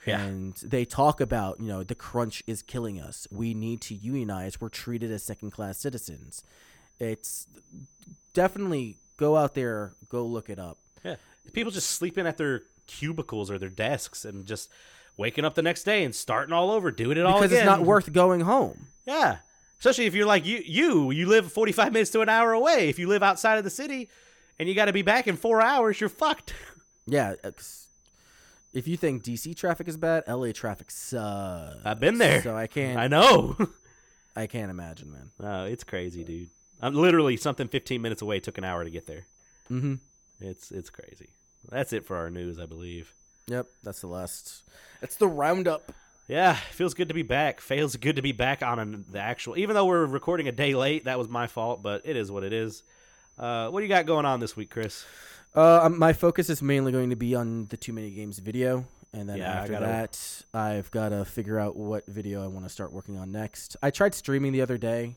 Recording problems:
high-pitched whine; faint; throughout; 6 kHz, 35 dB below the speech

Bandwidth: 18 kHz